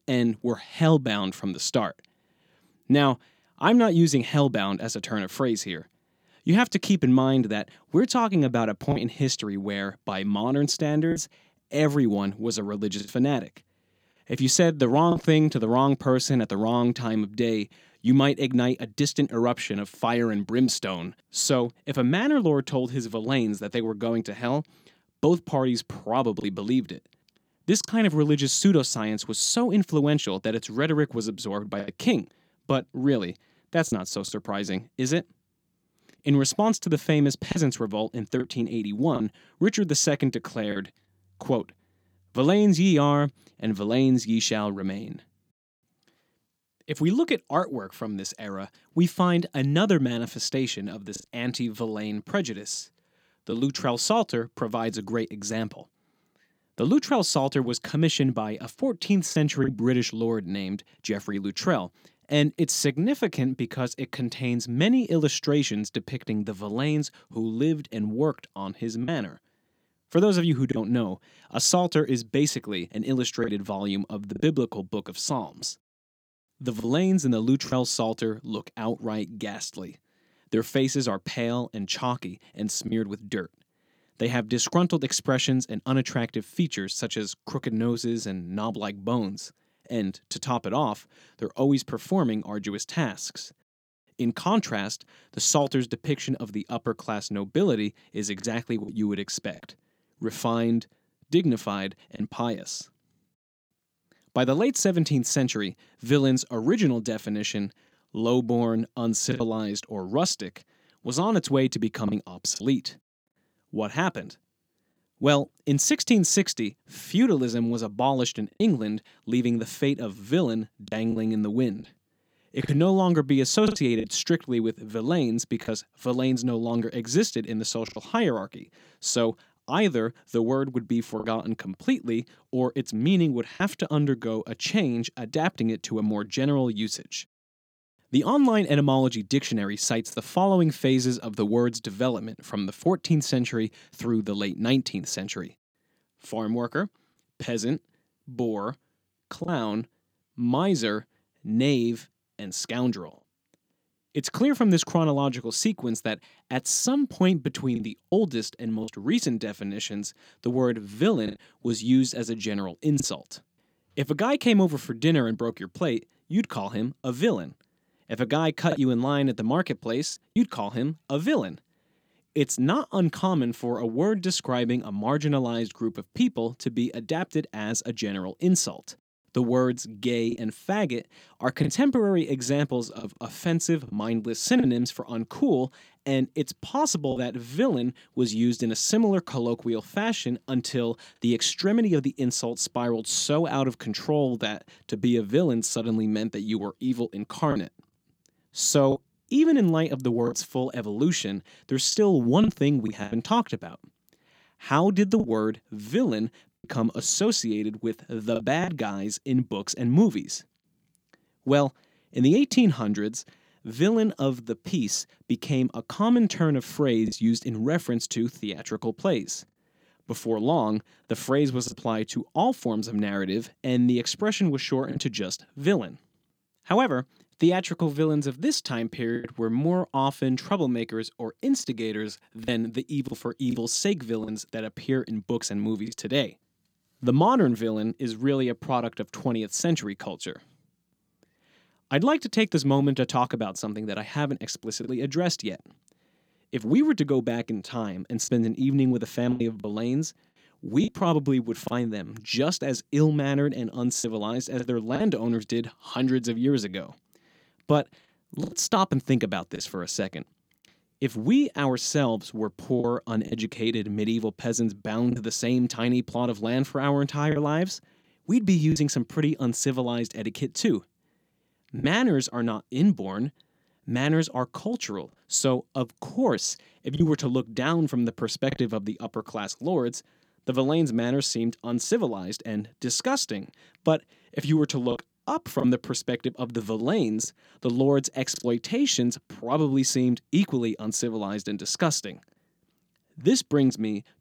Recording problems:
choppy; occasionally; 2% of the speech affected

